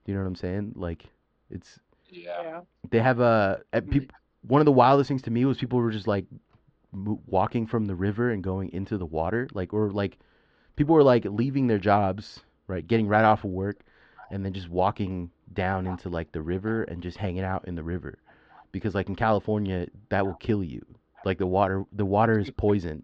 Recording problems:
muffled; very slightly; fading above 4 kHz

